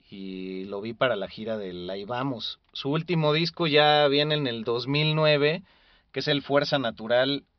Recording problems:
high frequencies cut off; noticeable; nothing above 5.5 kHz

